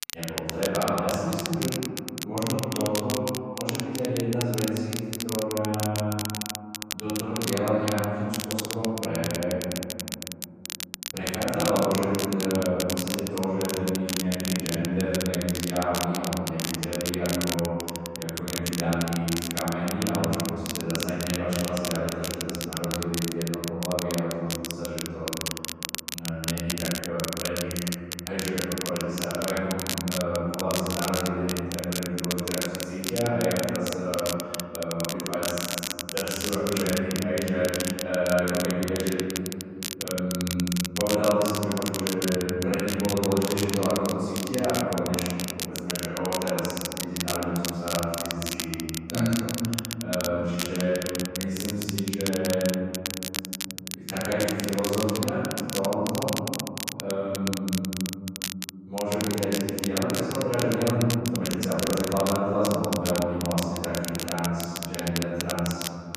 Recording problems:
room echo; strong; dies away in 2.6 s
off-mic speech; far
crackle, like an old record; loud; 5 dB below the speech
uneven, jittery; strongly; from 11 s to 1:03

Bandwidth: 14.5 kHz